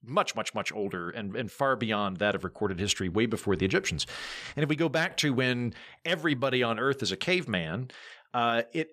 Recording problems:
none

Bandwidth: 14.5 kHz